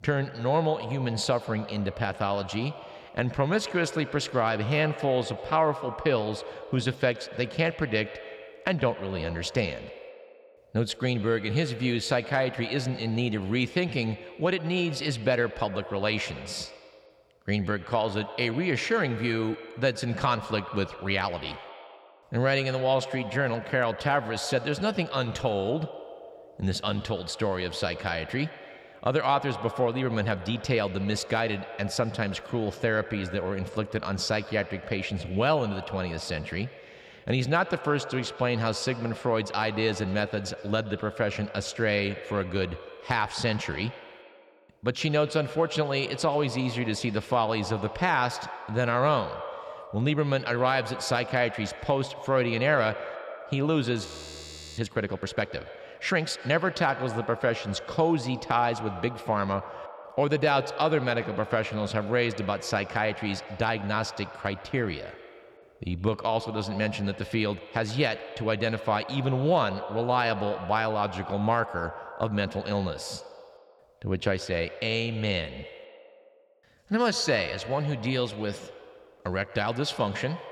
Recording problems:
echo of what is said; noticeable; throughout; 120 ms later, 15 dB below the speech
audio freezing; at 54 s for 0.5 s

